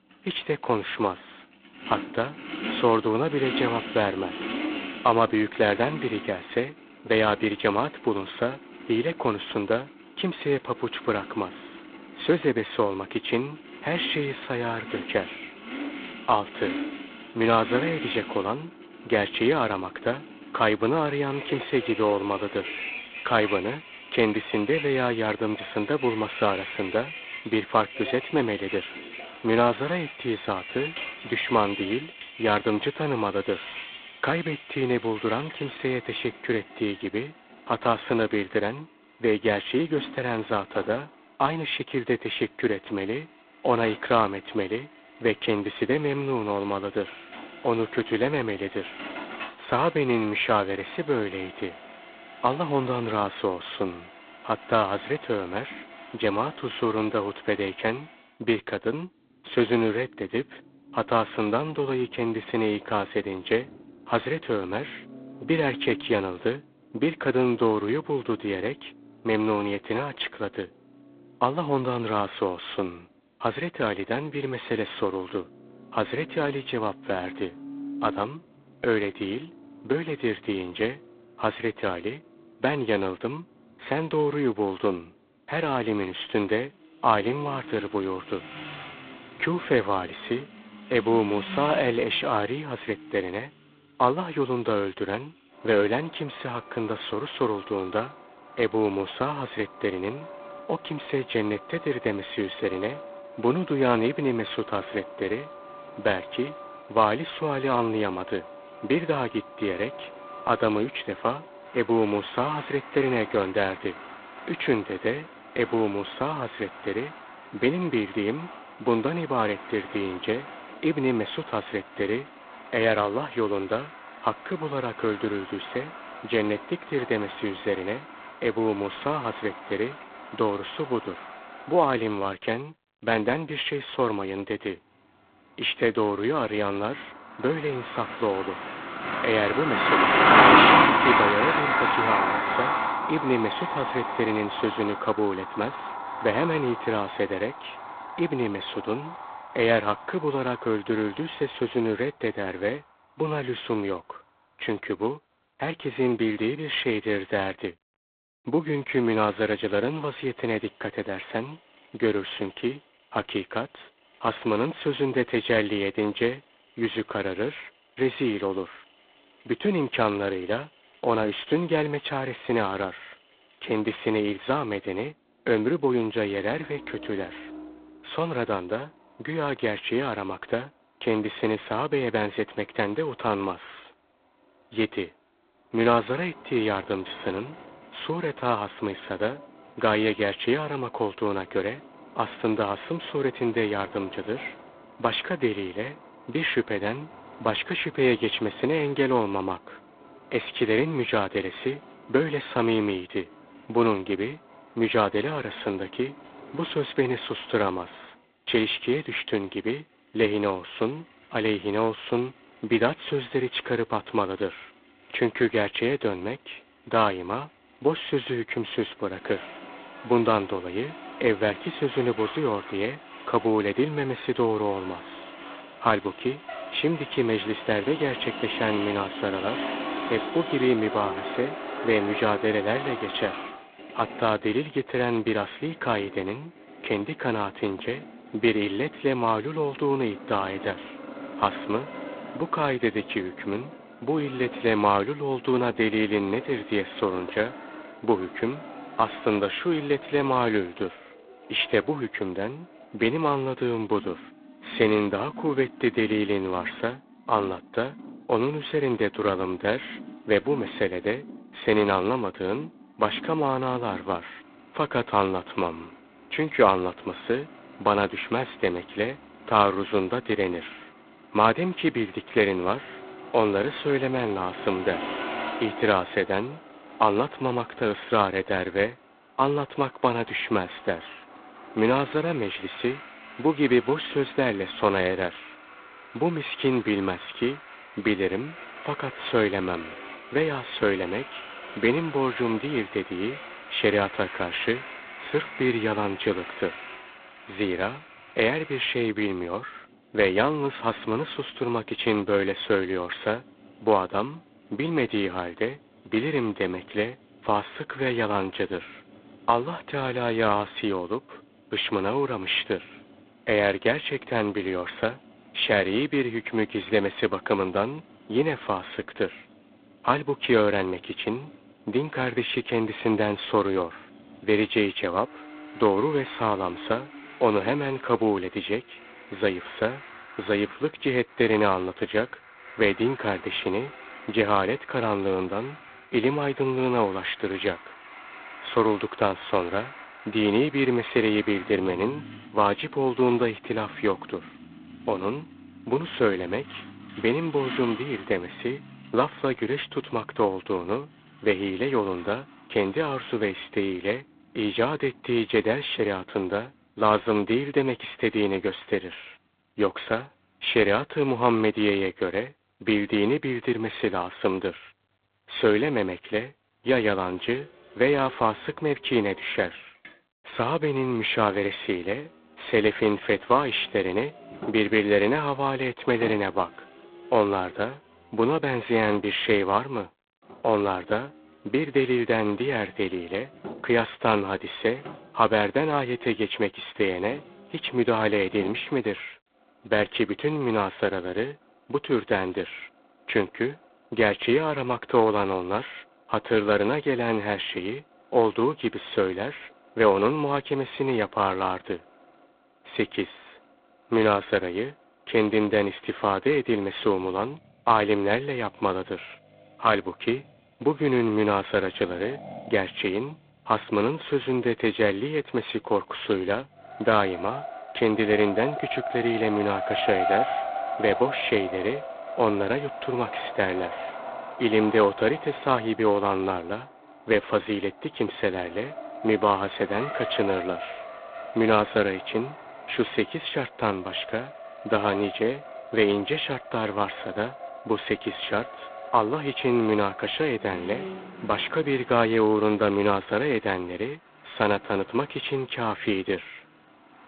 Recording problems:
phone-call audio; poor line; nothing above 3.5 kHz
traffic noise; loud; throughout; 7 dB below the speech

